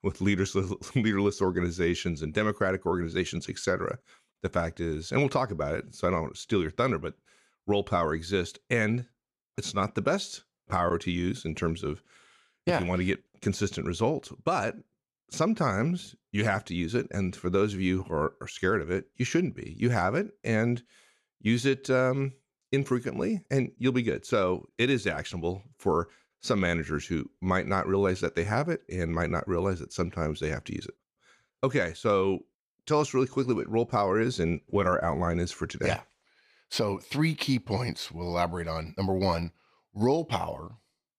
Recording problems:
none

